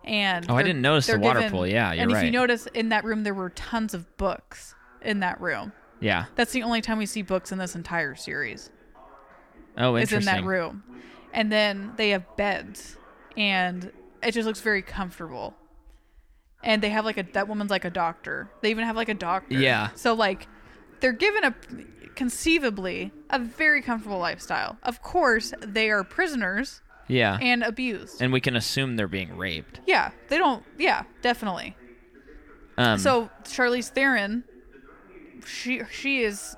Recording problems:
voice in the background; faint; throughout; 25 dB below the speech

